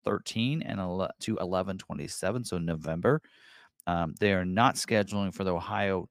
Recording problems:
uneven, jittery; strongly; from 0.5 to 5.5 s

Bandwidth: 15 kHz